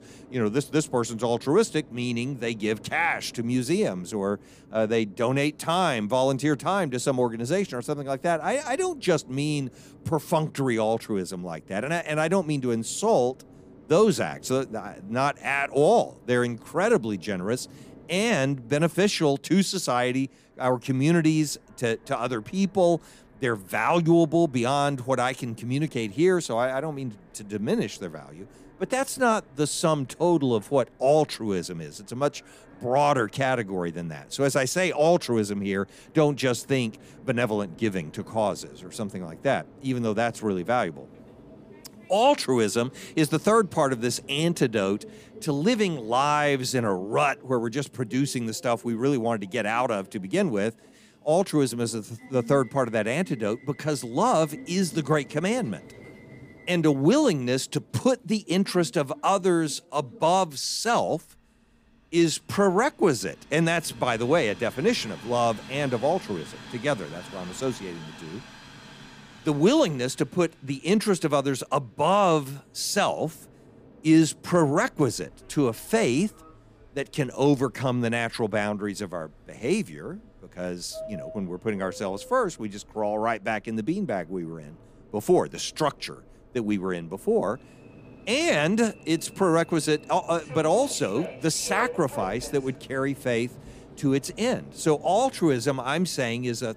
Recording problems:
train or aircraft noise; faint; throughout; 20 dB below the speech

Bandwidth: 15 kHz